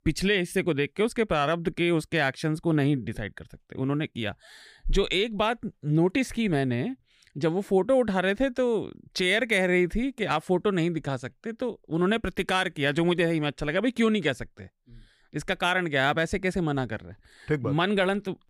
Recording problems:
none

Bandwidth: 15 kHz